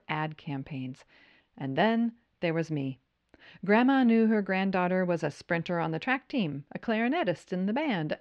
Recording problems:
muffled; slightly; fading above 3 kHz

